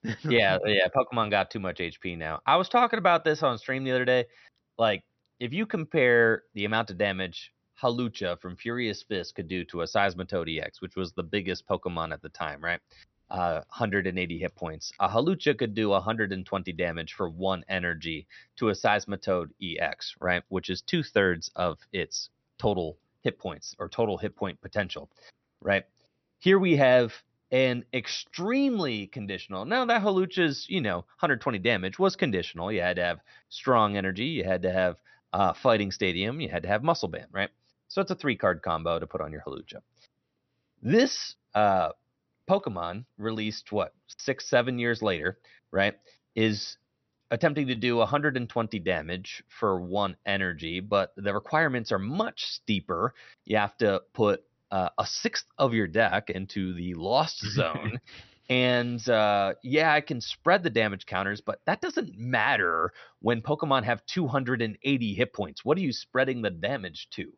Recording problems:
high frequencies cut off; noticeable; nothing above 6 kHz

